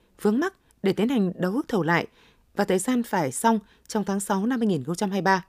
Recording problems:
none

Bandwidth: 15 kHz